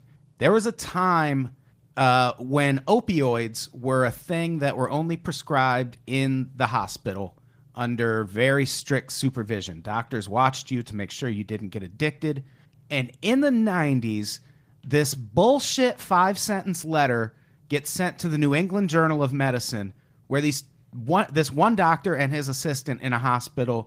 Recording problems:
garbled, watery; slightly; nothing above 15.5 kHz

